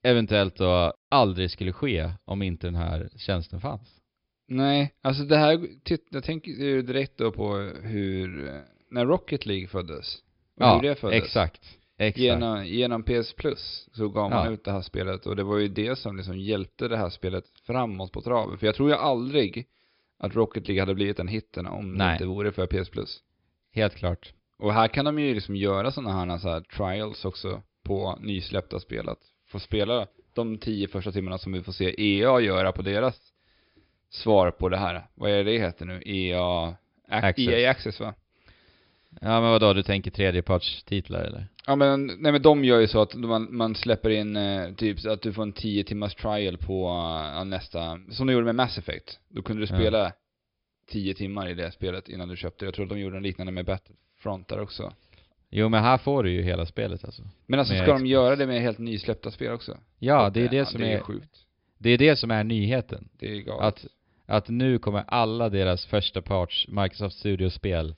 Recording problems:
high frequencies cut off; noticeable; nothing above 5.5 kHz

